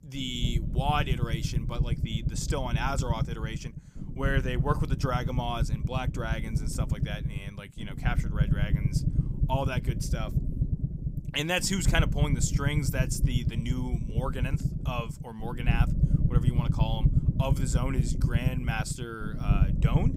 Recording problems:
low rumble; loud; throughout; 7 dB below the speech

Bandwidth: 15.5 kHz